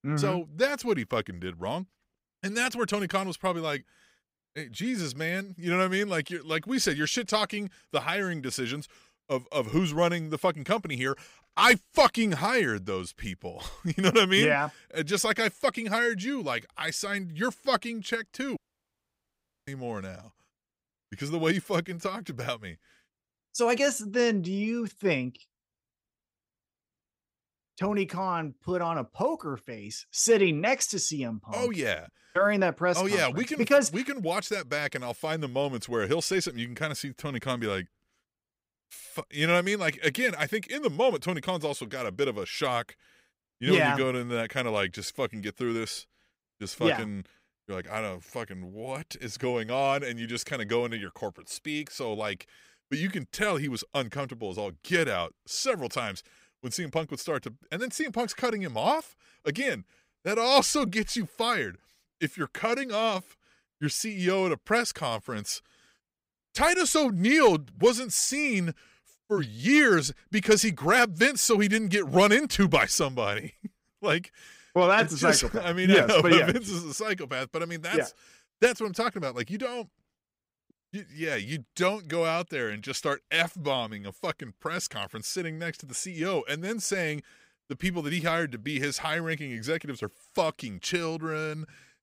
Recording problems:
audio cutting out; at 19 s for 1 s

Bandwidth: 15.5 kHz